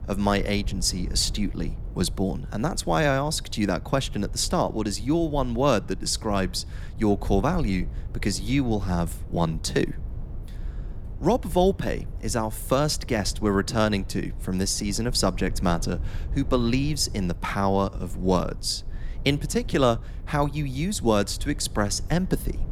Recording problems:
low rumble; faint; throughout; 25 dB below the speech

